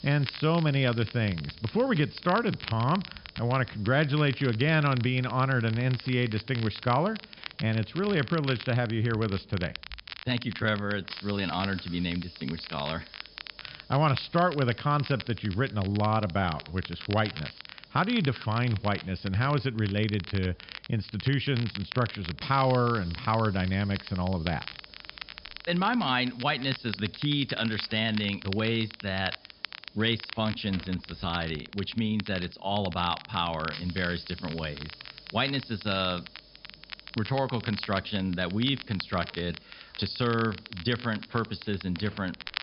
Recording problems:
high frequencies cut off; noticeable; nothing above 5.5 kHz
crackle, like an old record; noticeable; 15 dB below the speech
hiss; faint; throughout; 25 dB below the speech

